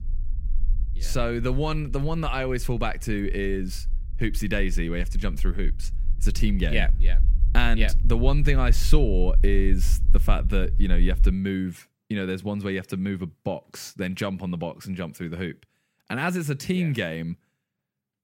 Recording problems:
low rumble; faint; until 11 s; 20 dB below the speech

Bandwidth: 16 kHz